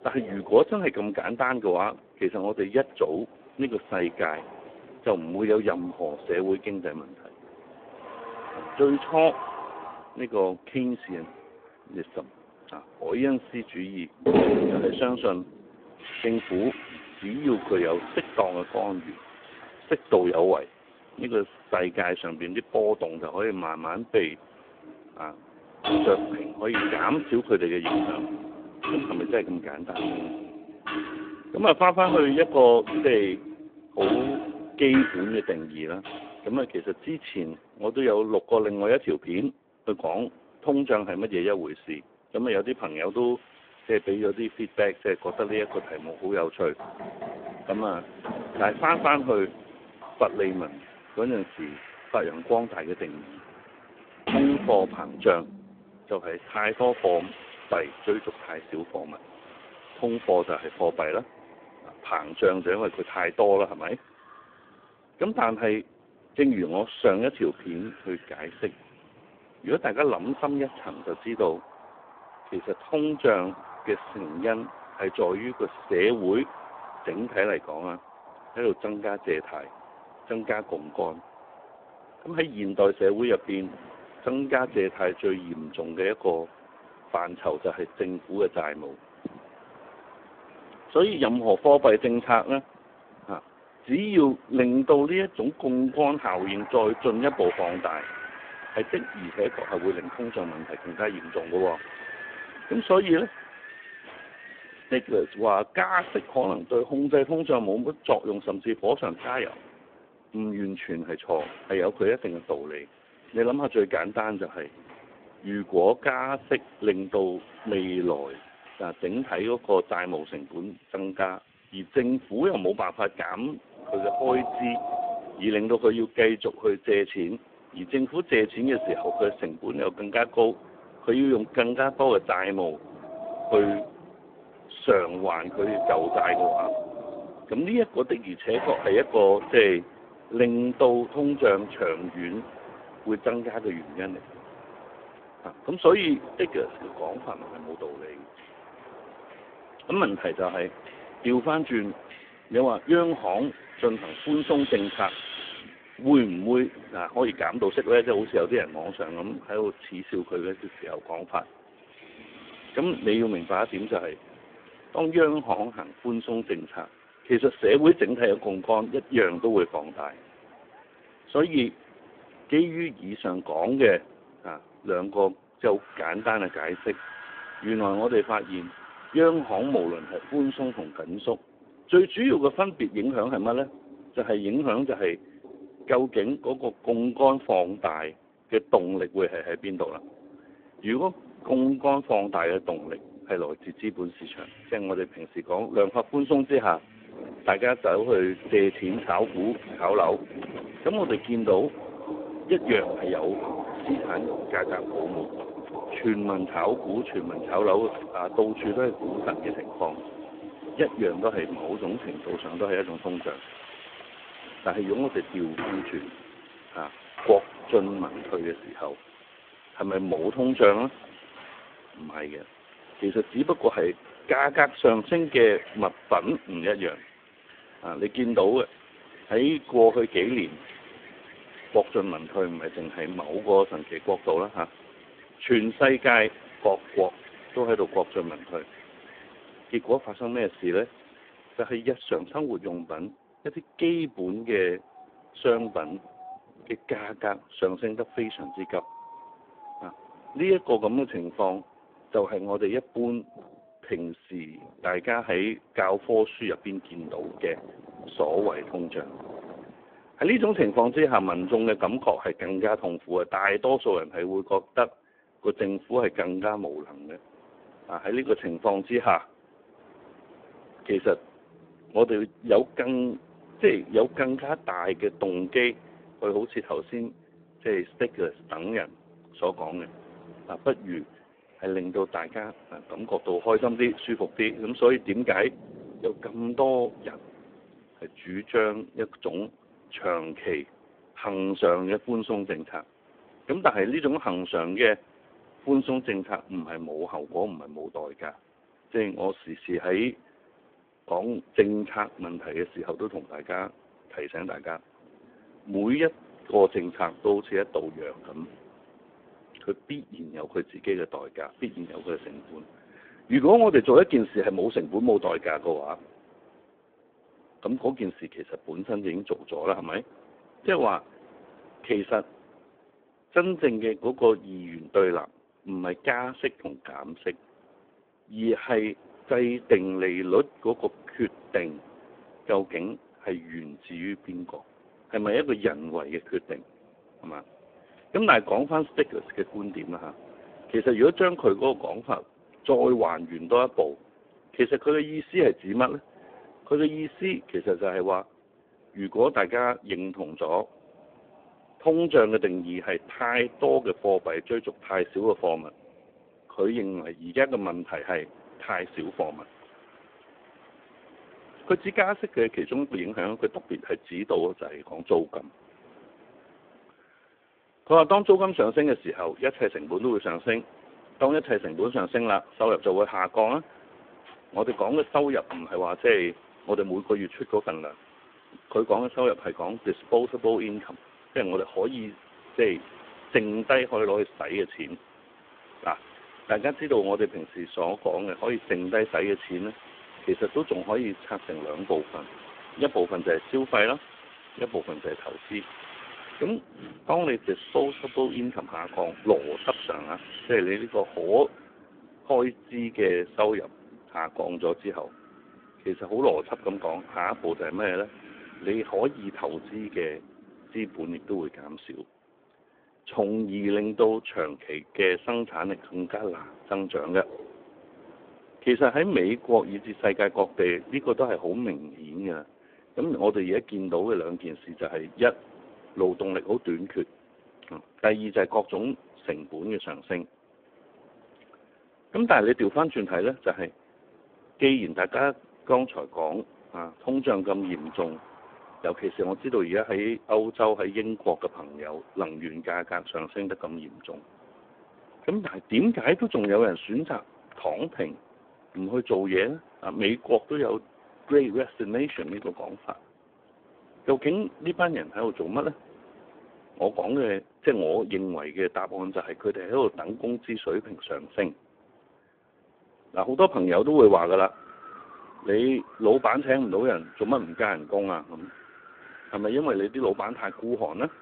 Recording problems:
phone-call audio; poor line
household noises; noticeable; until 3:59; 10 dB below the speech
wind in the background; noticeable; throughout; 20 dB below the speech

